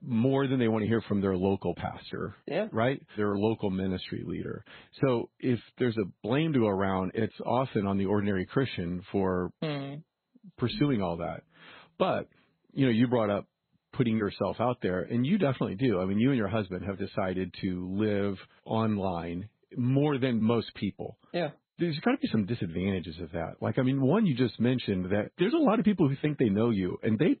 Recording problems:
garbled, watery; badly; nothing above 4 kHz

